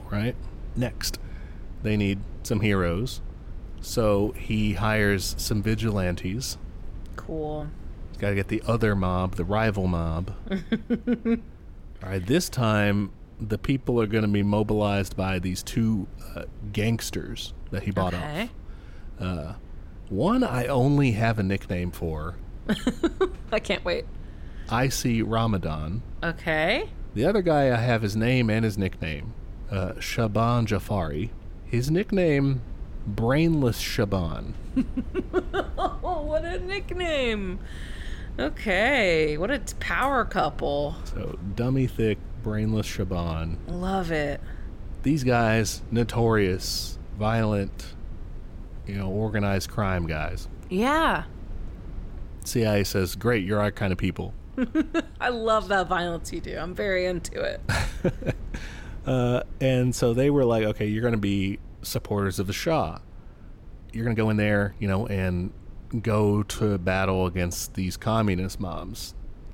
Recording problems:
low rumble; faint; throughout; 25 dB below the speech
uneven, jittery; strongly; from 7.5 s to 1:05

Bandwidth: 16.5 kHz